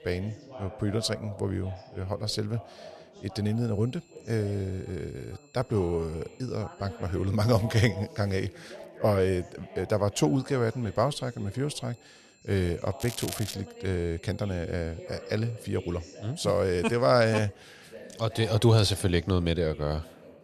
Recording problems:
background chatter; noticeable; throughout; 2 voices, 20 dB below the speech
crackling; noticeable; at 13 s; 10 dB below the speech
high-pitched whine; faint; from 3.5 to 7.5 s and from 10 to 17 s; 2.5 kHz, 30 dB below the speech

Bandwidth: 13.5 kHz